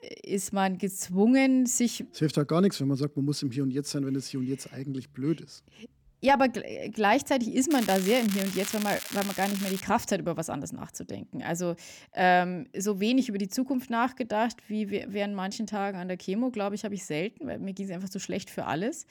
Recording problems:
crackling; loud; from 7.5 to 10 s; 7 dB below the speech

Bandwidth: 18 kHz